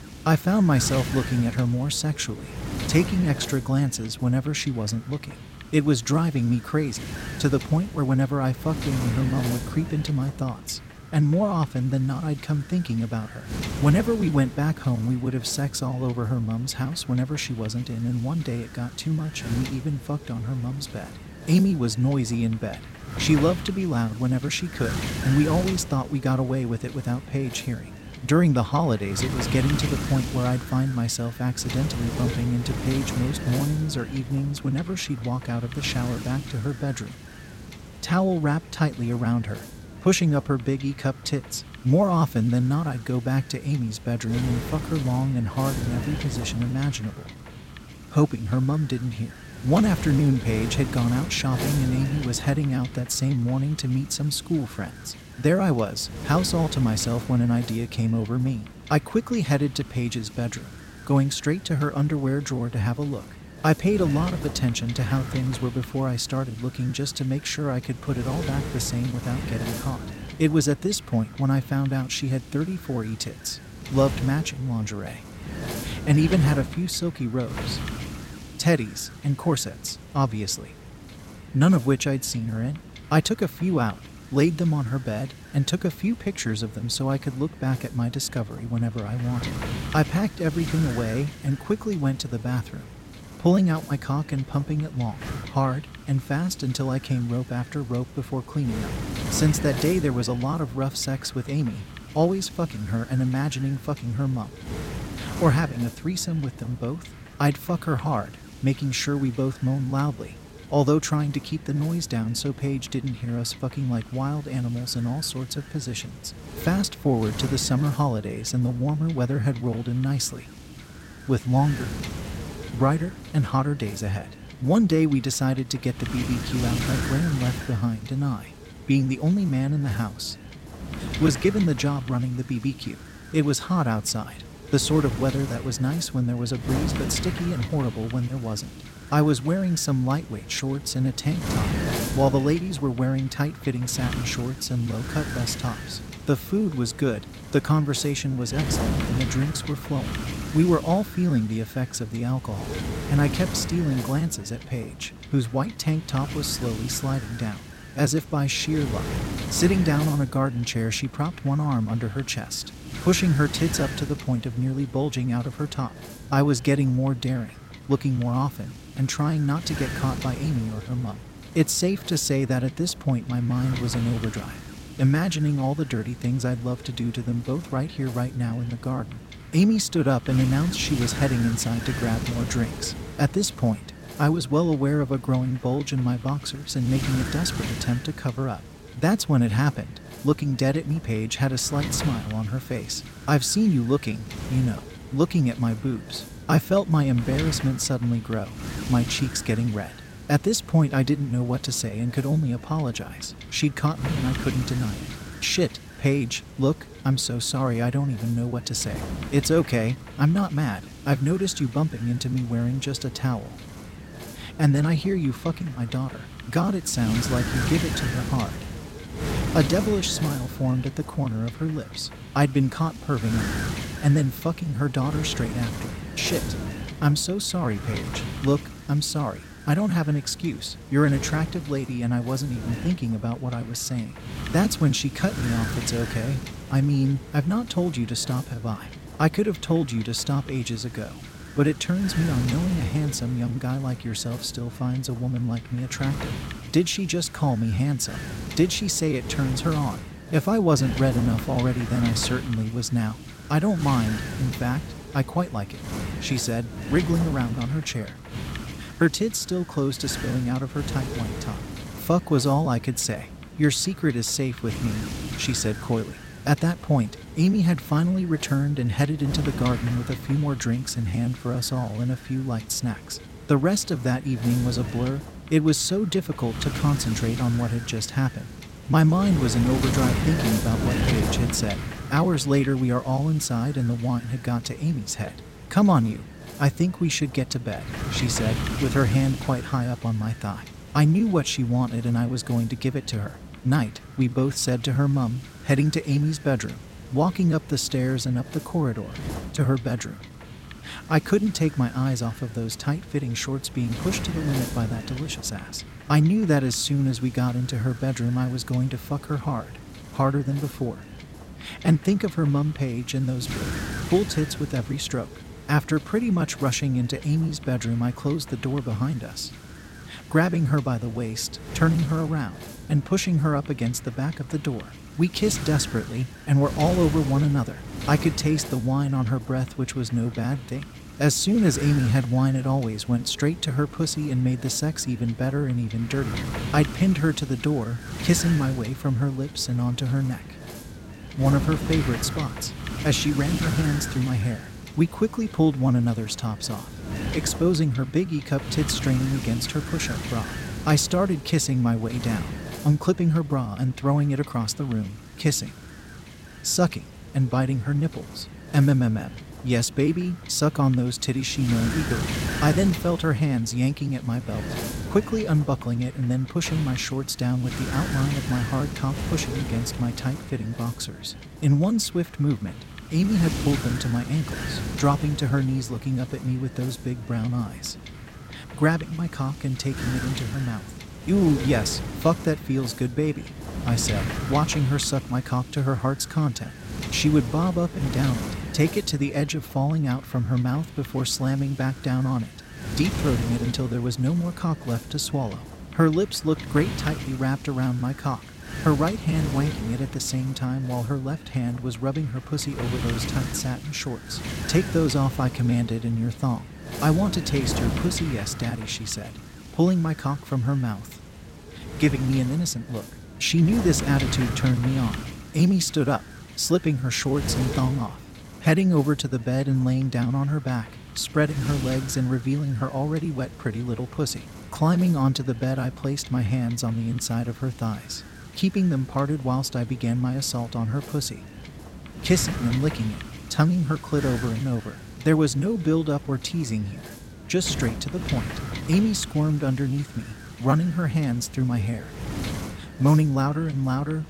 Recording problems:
wind noise on the microphone; heavy; 9 dB below the speech

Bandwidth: 16 kHz